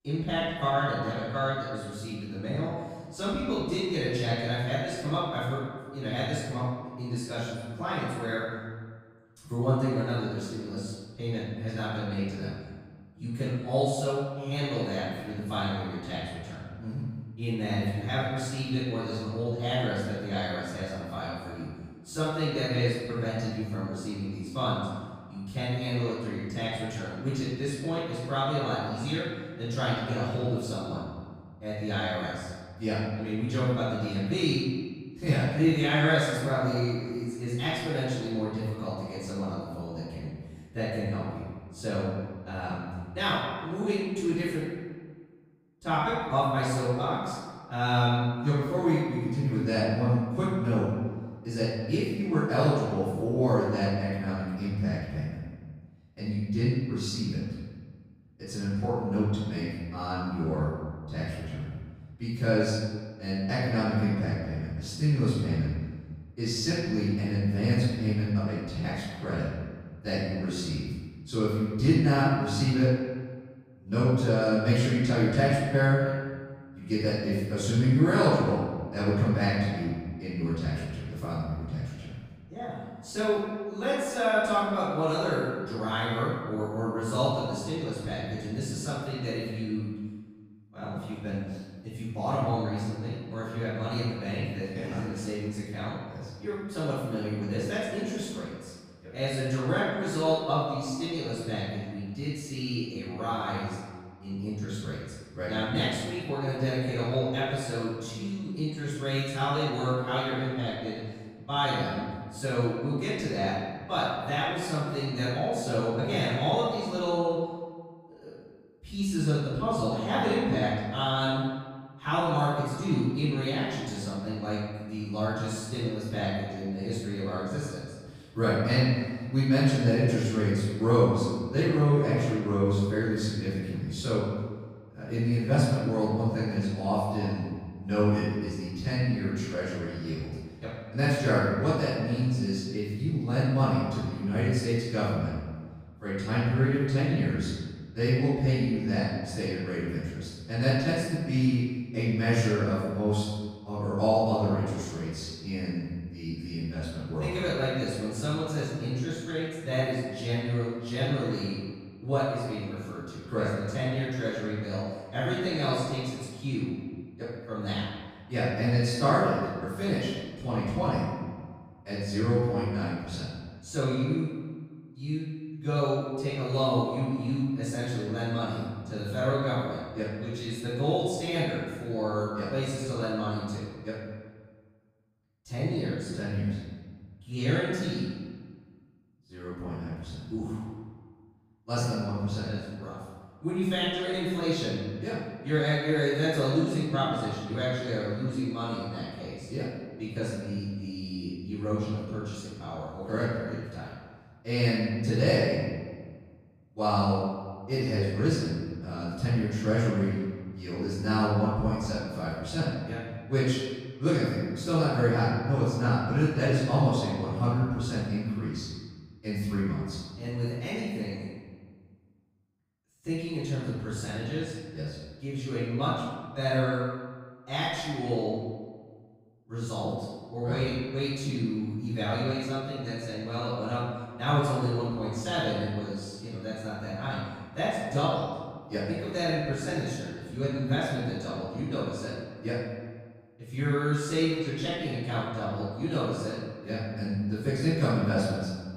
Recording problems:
room echo; strong; dies away in 1.4 s
off-mic speech; far

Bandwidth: 15.5 kHz